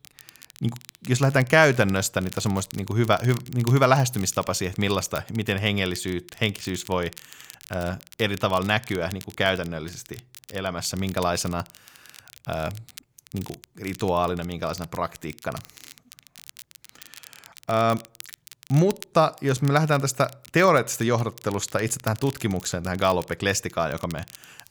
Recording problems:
crackle, like an old record; faint; 20 dB below the speech

